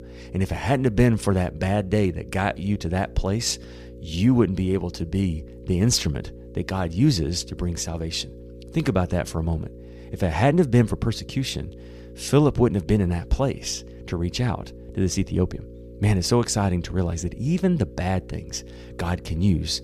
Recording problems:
electrical hum; noticeable; throughout; 60 Hz, 20 dB below the speech

